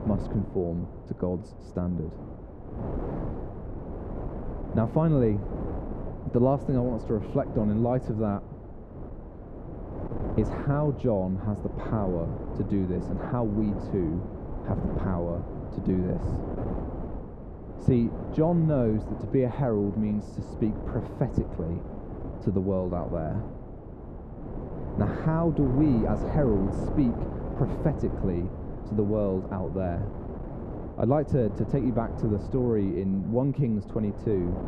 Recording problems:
muffled; very; fading above 1.5 kHz
wind noise on the microphone; heavy; 9 dB below the speech

